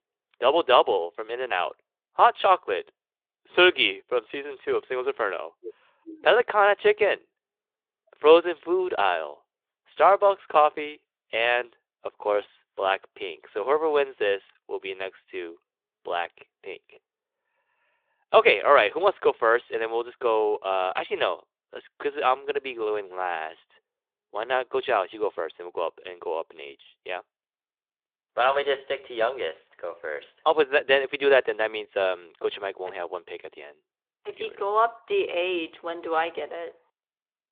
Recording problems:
phone-call audio

